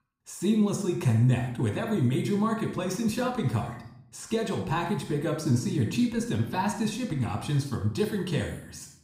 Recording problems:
room echo; noticeable; dies away in 0.6 s
off-mic speech; somewhat distant

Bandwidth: 15.5 kHz